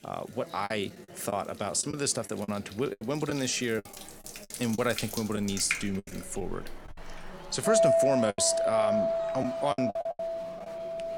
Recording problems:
household noises; very loud; throughout; 1 dB above the speech
murmuring crowd; noticeable; throughout; 15 dB below the speech
choppy; very; 8% of the speech affected

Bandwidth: 18.5 kHz